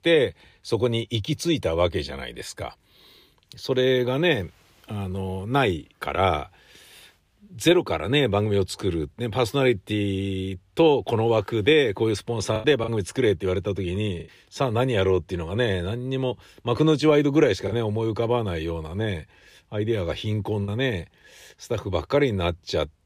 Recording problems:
choppy; occasionally; at 13 s and from 18 to 21 s; 3% of the speech affected

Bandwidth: 15 kHz